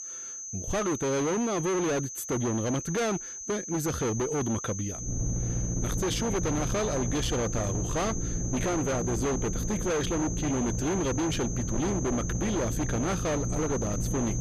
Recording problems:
distortion; heavy; 37% of the sound clipped
high-pitched whine; loud; throughout; 6.5 kHz, 7 dB below the speech
low rumble; loud; from 5 s on; 9 dB below the speech

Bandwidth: 14.5 kHz